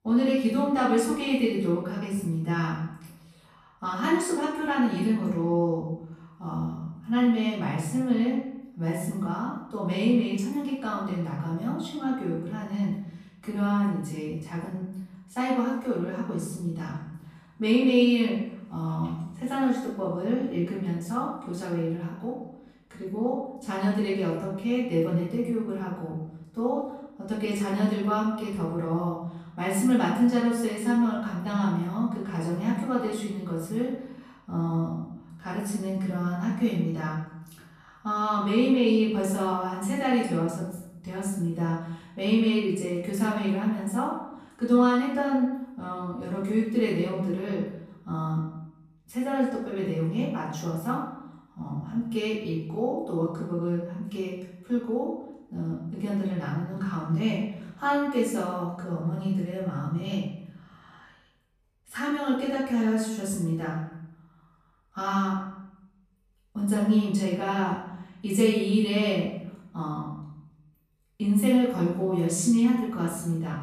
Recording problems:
off-mic speech; far
room echo; noticeable; dies away in 0.8 s

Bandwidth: 14.5 kHz